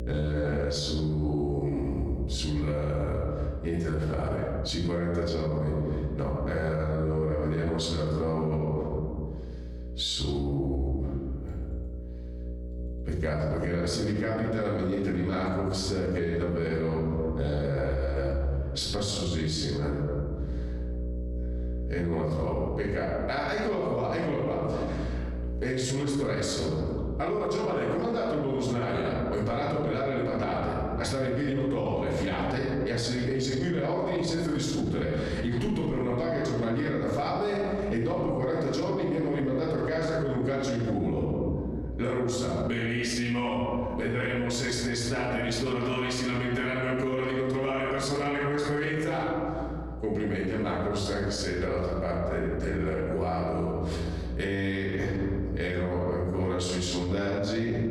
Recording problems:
off-mic speech; far
room echo; noticeable; dies away in 1.4 s
squashed, flat; somewhat
electrical hum; faint; throughout; 60 Hz, 20 dB below the speech

